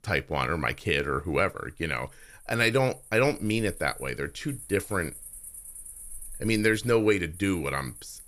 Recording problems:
animal sounds; noticeable; throughout; 15 dB below the speech

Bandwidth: 15 kHz